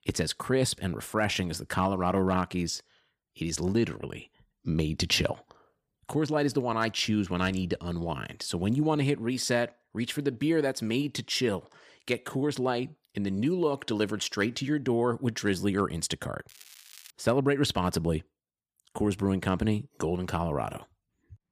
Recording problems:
crackling; faint; at 16 s, mostly in the pauses; 20 dB below the speech

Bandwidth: 15 kHz